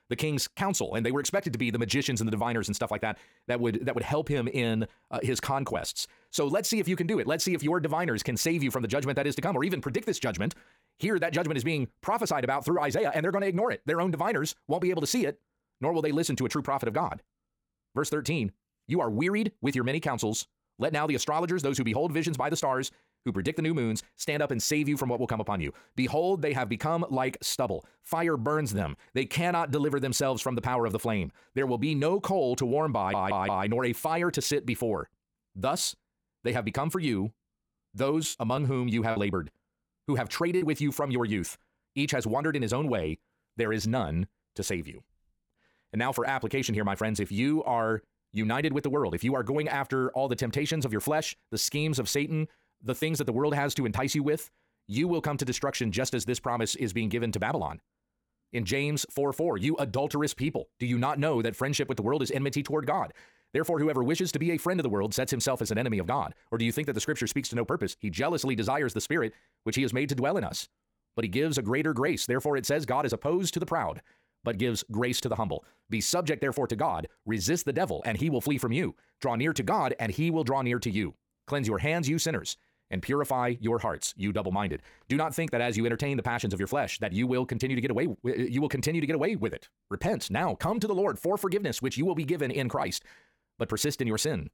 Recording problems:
wrong speed, natural pitch; too fast; 1.6 times normal speed
audio stuttering; at 33 s
choppy; very; from 38 to 41 s; 8% of the speech affected

